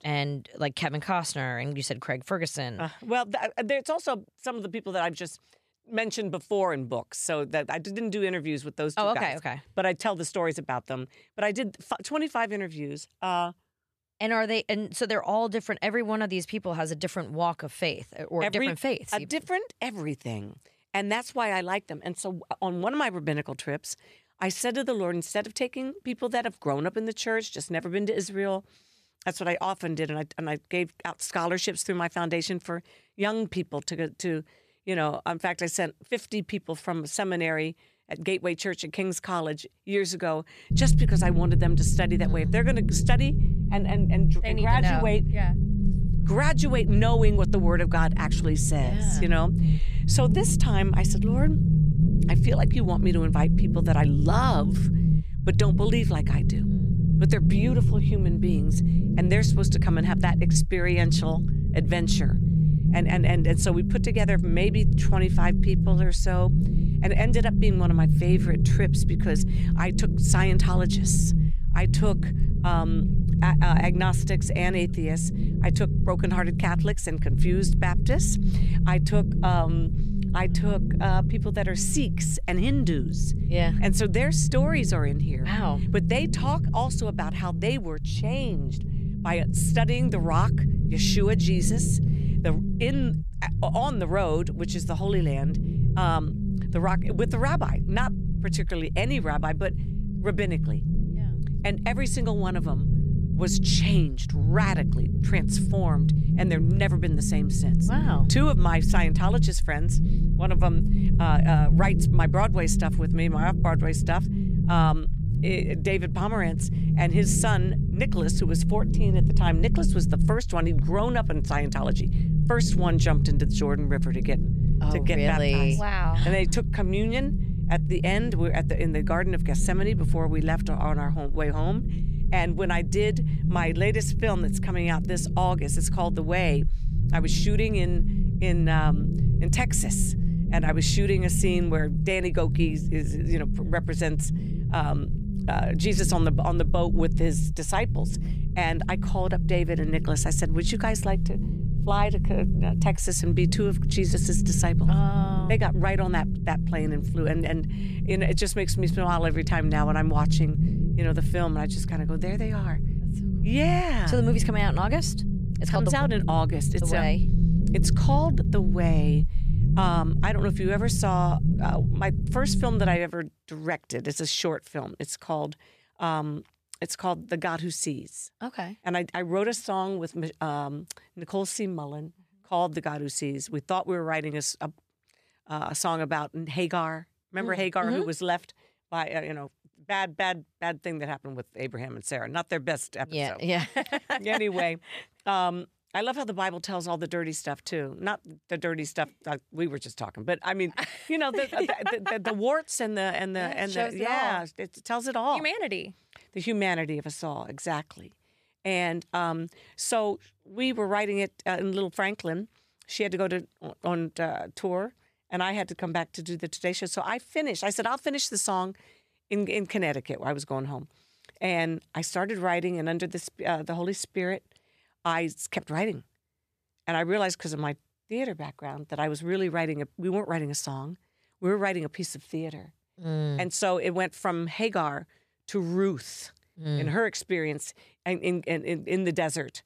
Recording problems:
low rumble; loud; from 41 s to 2:53; 6 dB below the speech

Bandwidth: 14 kHz